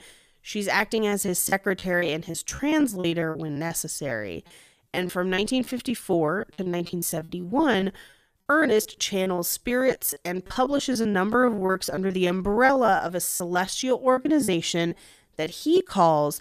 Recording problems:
choppy; very; 18% of the speech affected

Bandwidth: 14.5 kHz